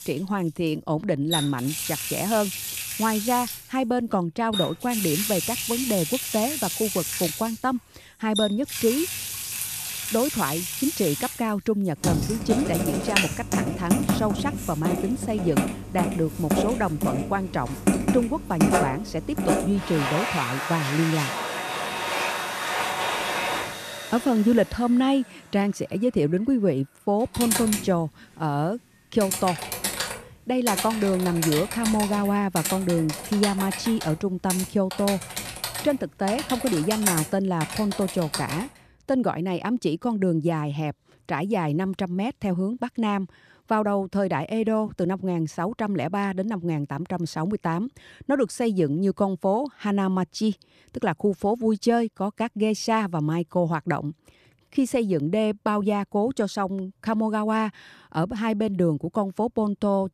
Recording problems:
household noises; loud; until 39 s; 2 dB below the speech

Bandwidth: 14.5 kHz